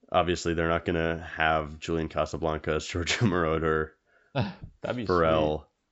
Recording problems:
high frequencies cut off; noticeable; nothing above 7.5 kHz

